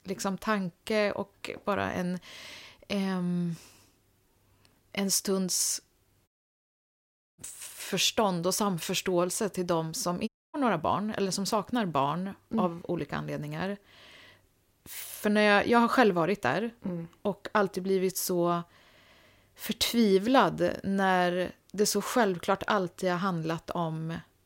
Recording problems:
audio cutting out; at 6.5 s for 1 s and at 10 s

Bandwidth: 16 kHz